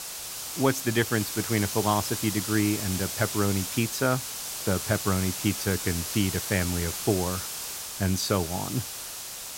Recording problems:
hiss; loud; throughout; 4 dB below the speech

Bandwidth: 16 kHz